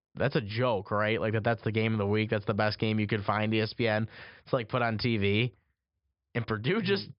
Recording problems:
high frequencies cut off; noticeable; nothing above 5.5 kHz

